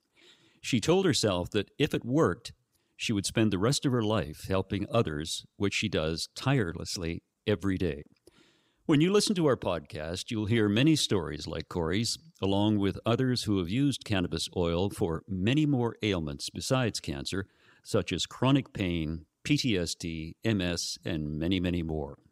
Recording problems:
none

